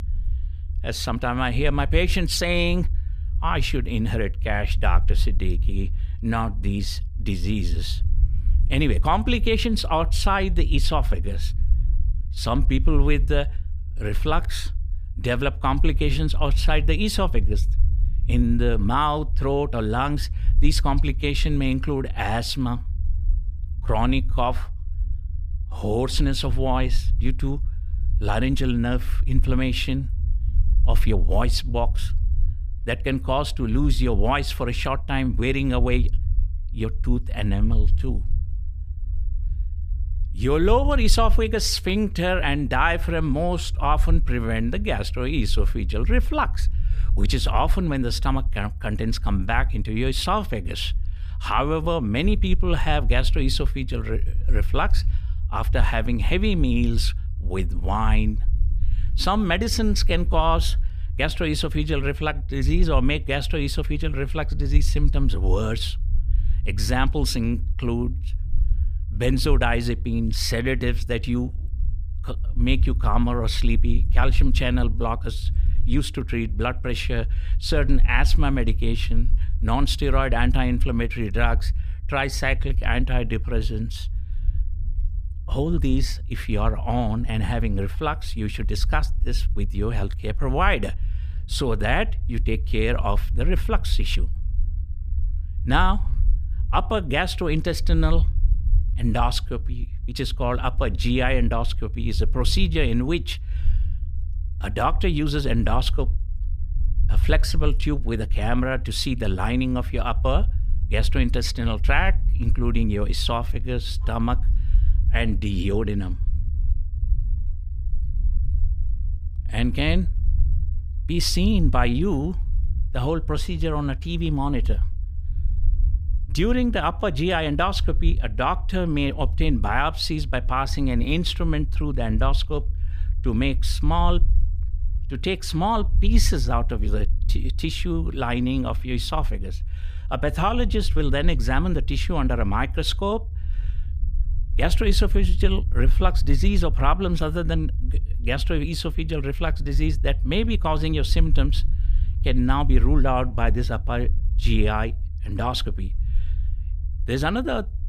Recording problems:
low rumble; faint; throughout; 20 dB below the speech

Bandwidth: 14.5 kHz